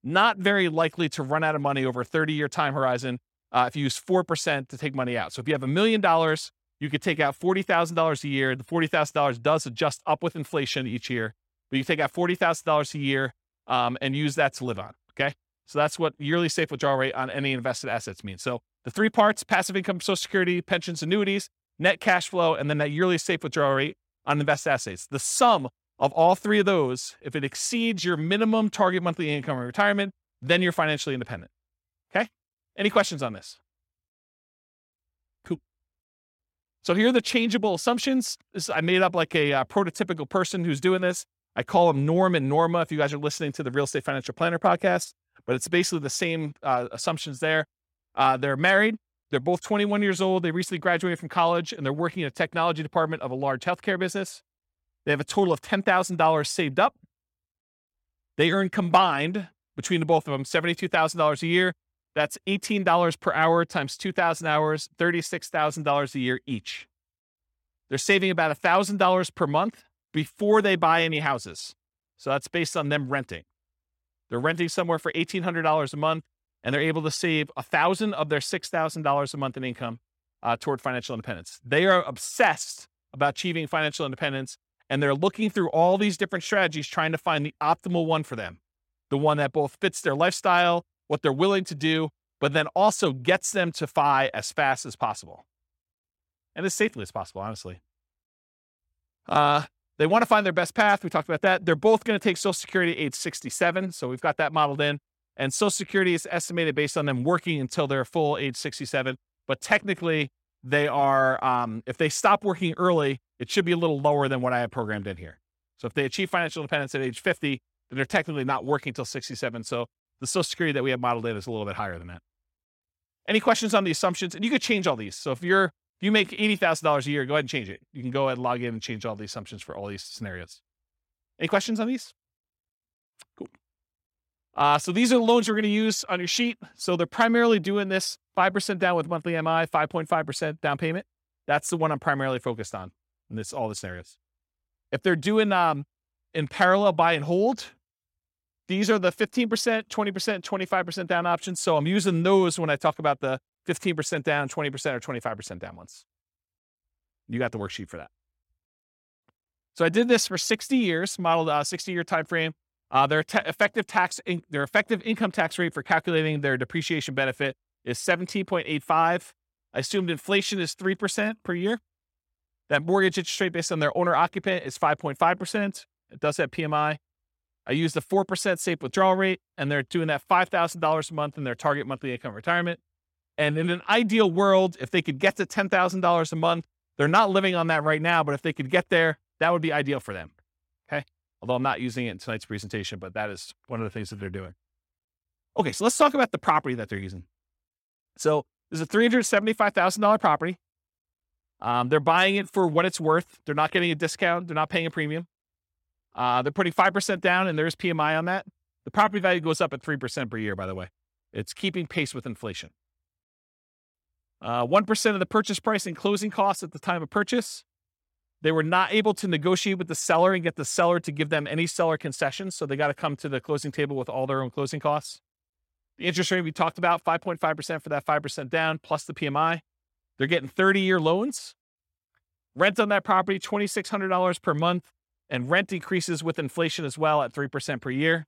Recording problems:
none

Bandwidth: 16.5 kHz